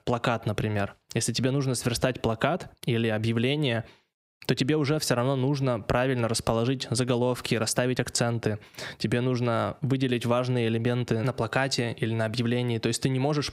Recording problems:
squashed, flat; heavily

